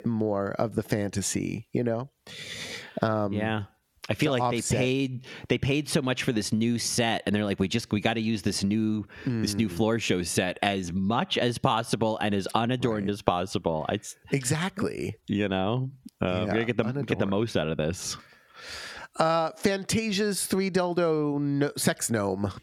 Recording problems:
squashed, flat; somewhat

